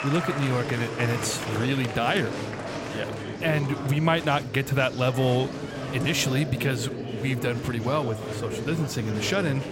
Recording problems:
murmuring crowd; loud; throughout; 6 dB below the speech

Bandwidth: 16 kHz